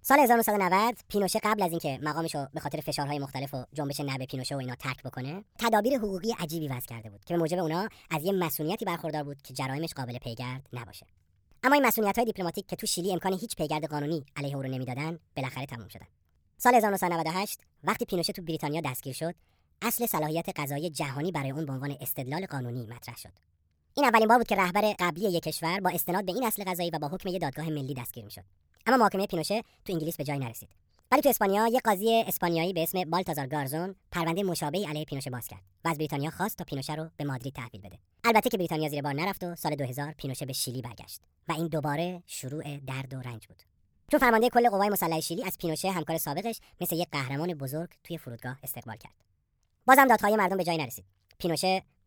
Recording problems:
wrong speed and pitch; too fast and too high; 1.5 times normal speed

